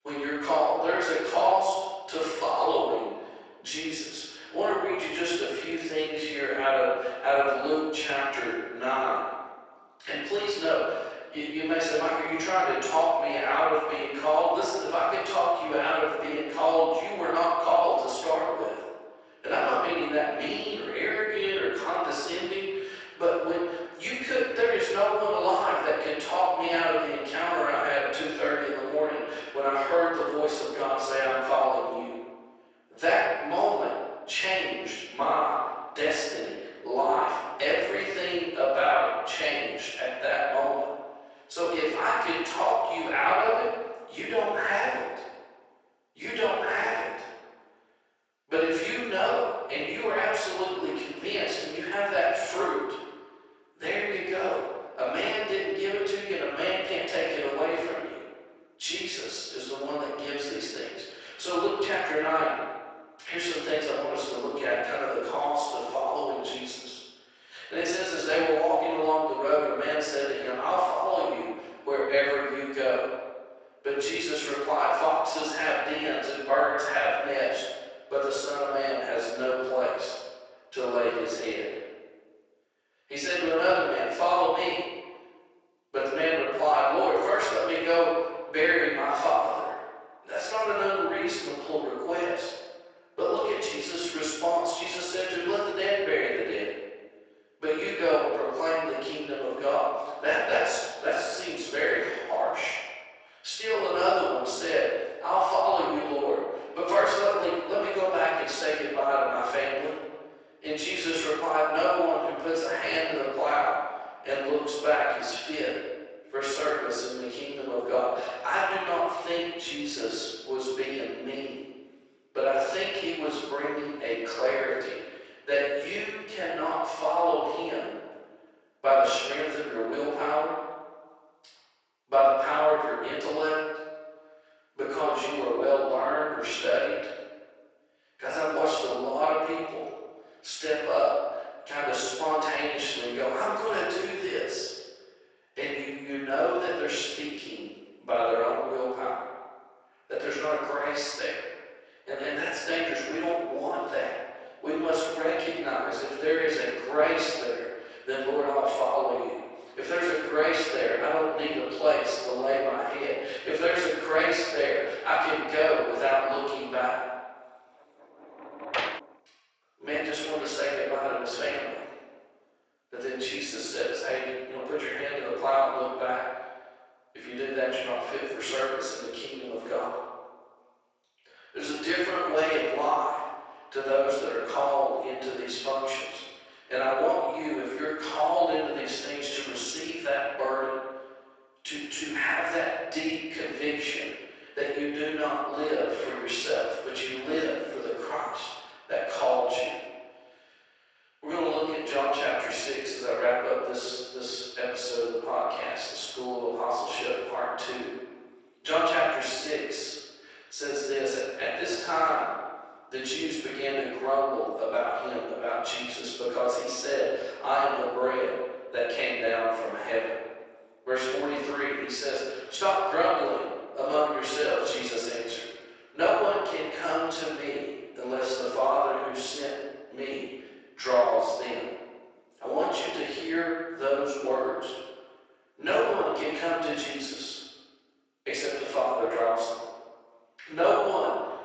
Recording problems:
room echo; strong; dies away in 1.2 s
off-mic speech; far
thin; very; fading below 450 Hz
garbled, watery; slightly; nothing above 7.5 kHz
door banging; noticeable; at 2:48; peak 2 dB below the speech

